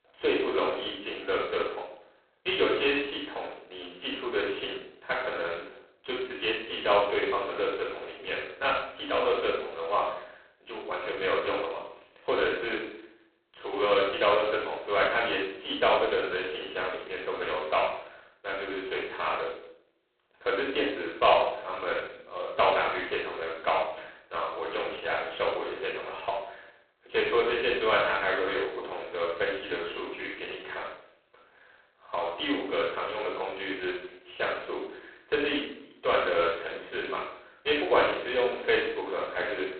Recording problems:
phone-call audio; poor line; nothing above 4 kHz
off-mic speech; far
room echo; noticeable; dies away in 0.7 s

